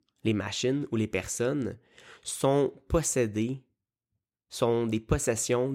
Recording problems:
abrupt cut into speech; at the end

